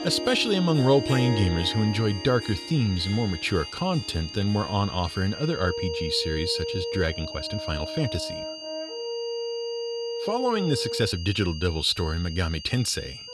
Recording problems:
background music; loud; throughout; 8 dB below the speech
high-pitched whine; noticeable; throughout; 4.5 kHz, 10 dB below the speech
uneven, jittery; strongly; from 2.5 to 12 s

